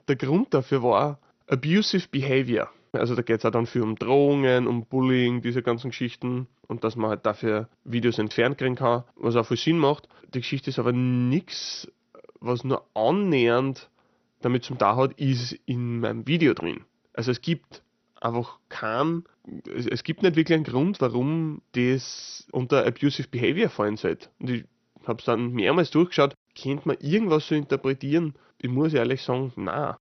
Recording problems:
garbled, watery; slightly; nothing above 6 kHz

